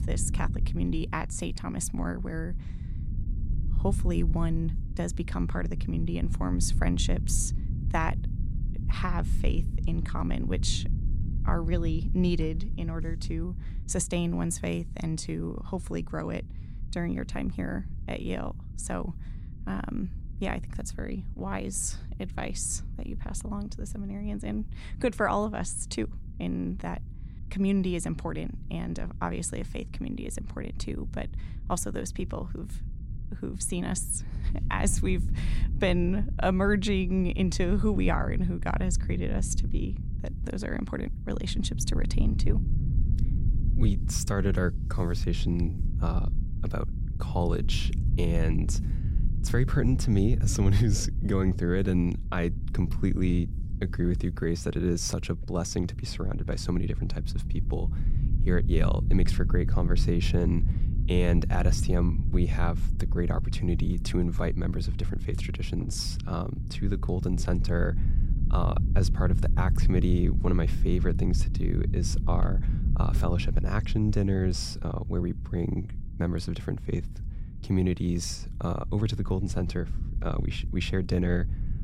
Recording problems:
low rumble; noticeable; throughout; 15 dB below the speech

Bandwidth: 16 kHz